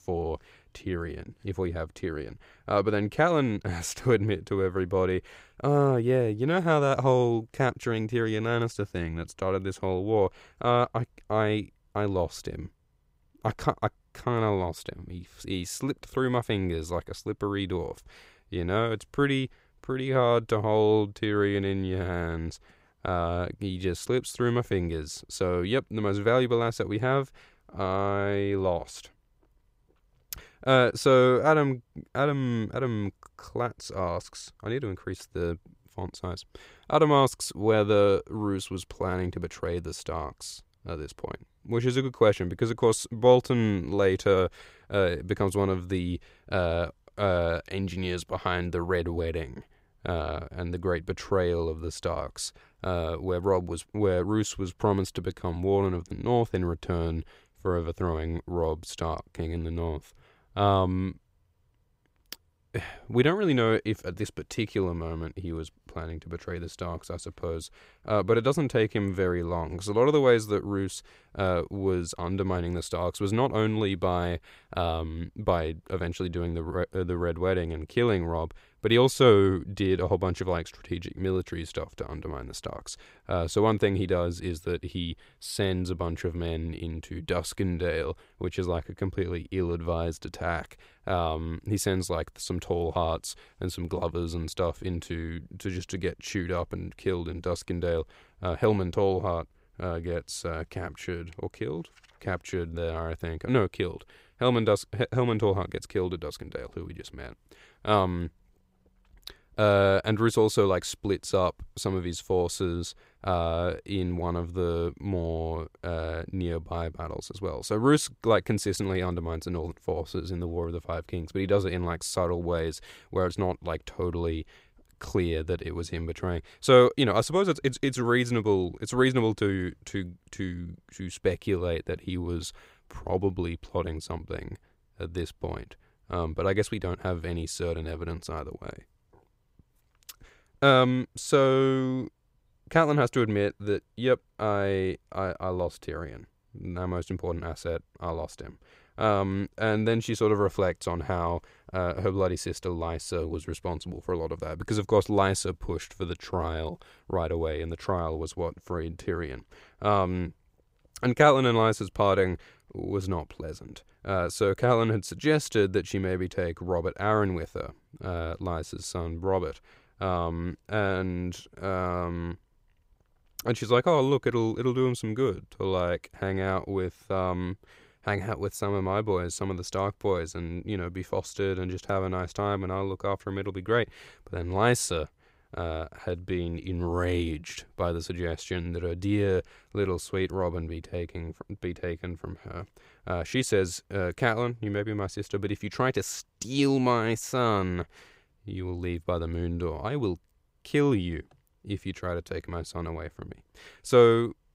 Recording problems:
none

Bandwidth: 15.5 kHz